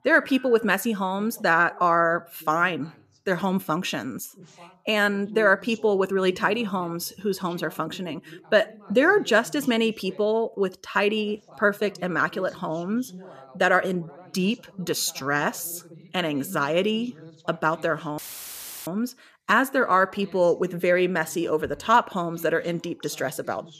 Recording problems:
voice in the background; faint; throughout; 25 dB below the speech
audio cutting out; filled with static; at 18 s for 0.5 s

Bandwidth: 14.5 kHz